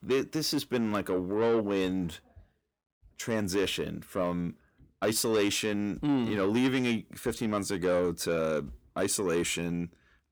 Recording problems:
distortion; slight; 10 dB below the speech

